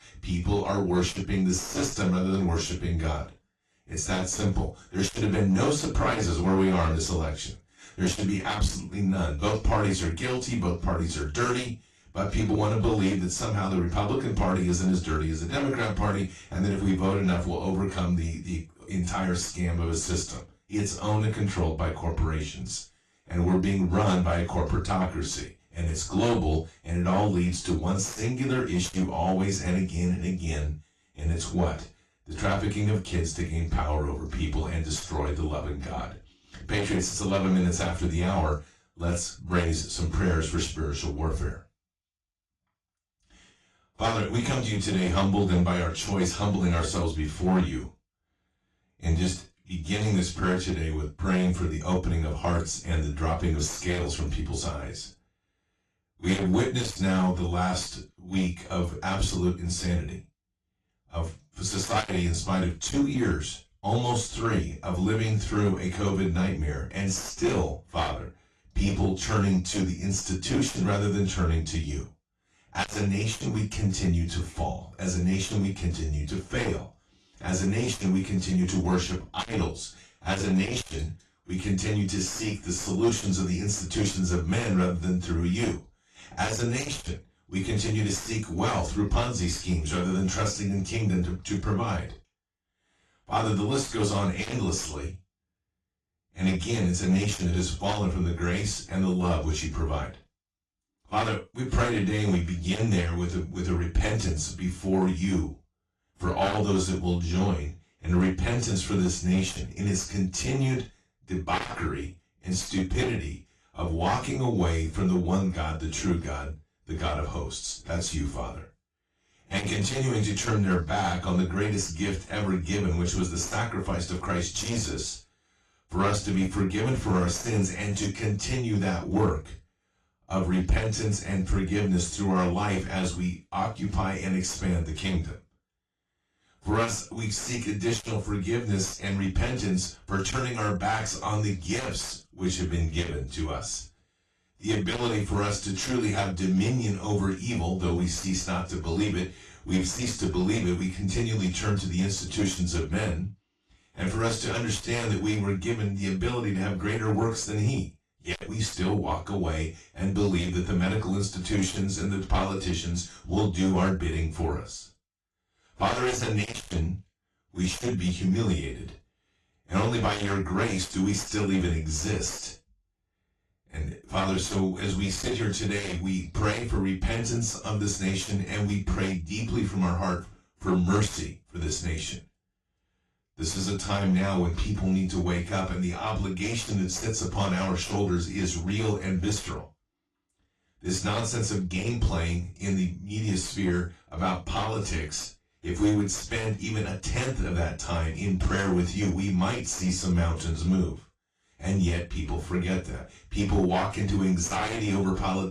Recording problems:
off-mic speech; far
room echo; slight; dies away in 0.2 s
distortion; slight; 7% of the sound clipped
garbled, watery; slightly

